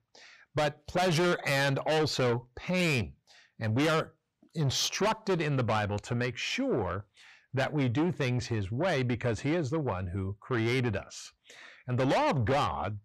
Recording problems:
distortion; heavy; 6 dB below the speech

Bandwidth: 15 kHz